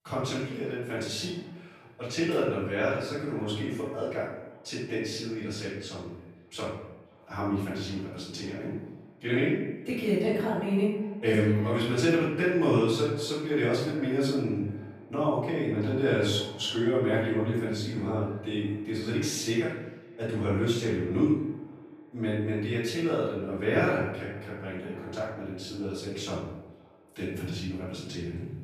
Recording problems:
off-mic speech; far
room echo; noticeable; dies away in 0.8 s
echo of what is said; faint; throughout; 510 ms later, 25 dB below the speech

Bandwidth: 15 kHz